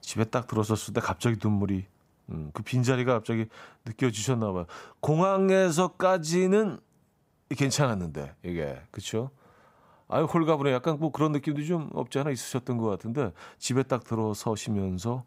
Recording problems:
none

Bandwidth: 15.5 kHz